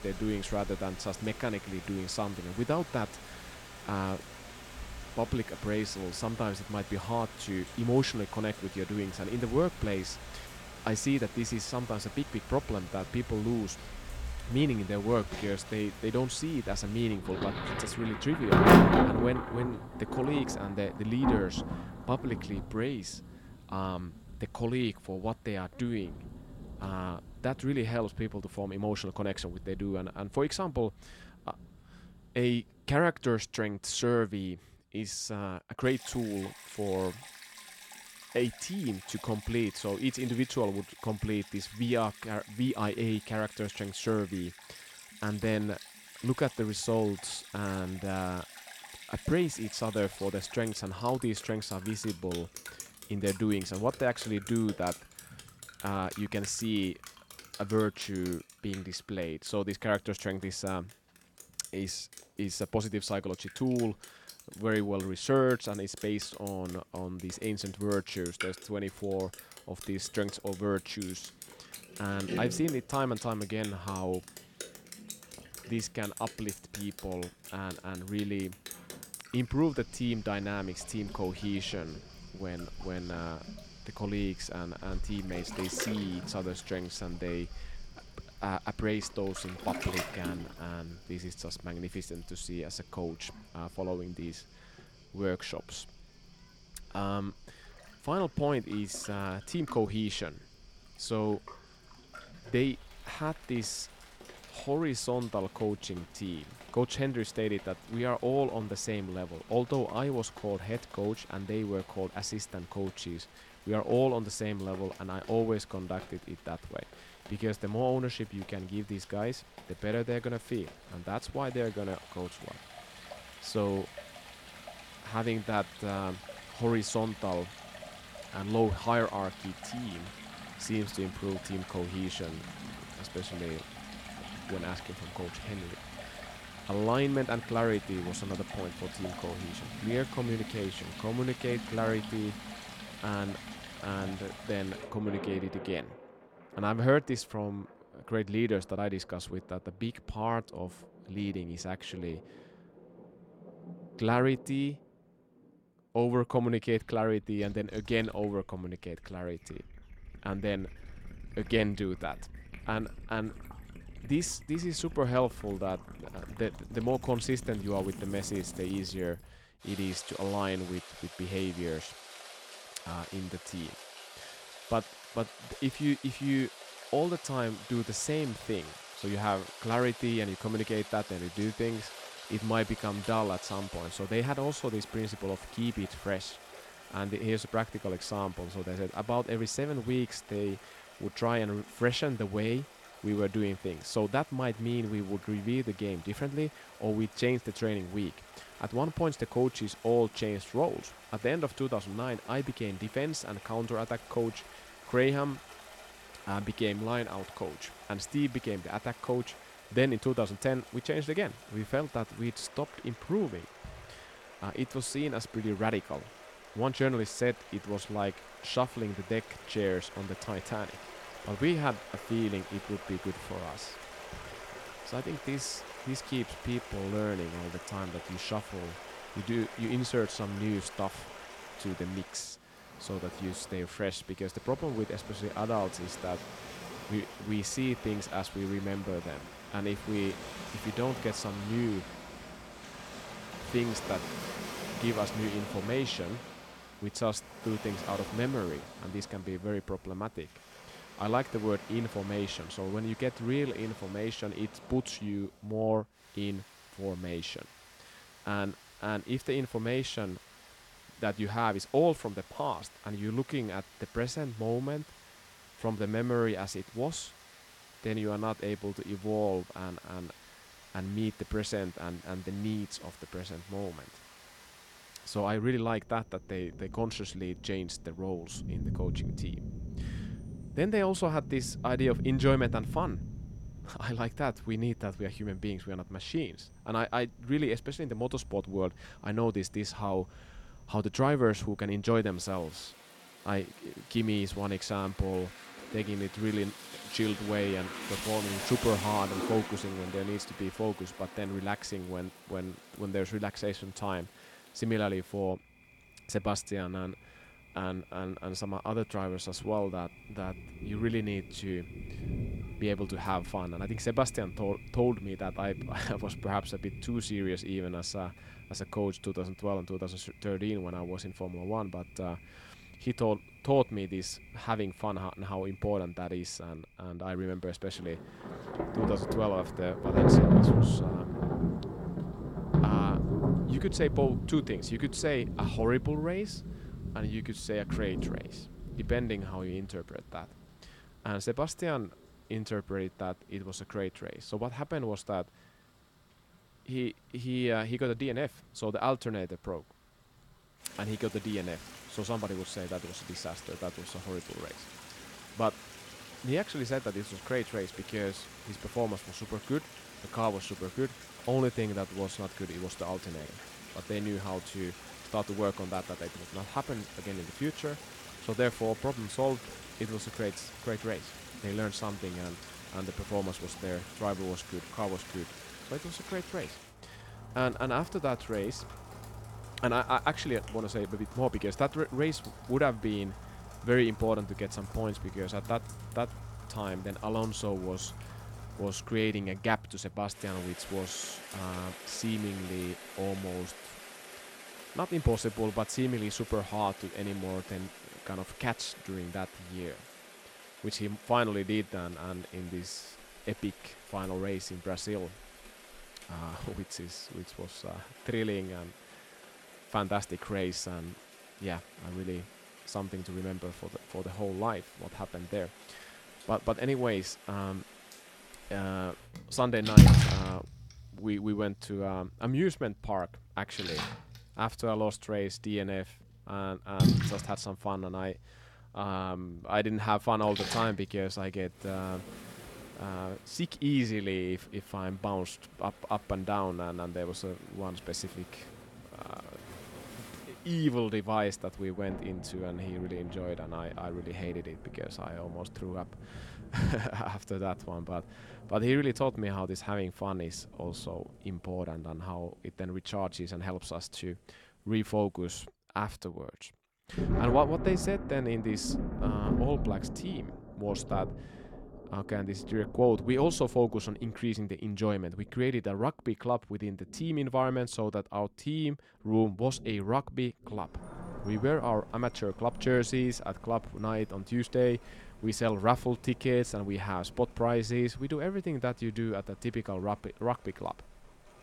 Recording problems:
rain or running water; loud; throughout; 5 dB below the speech

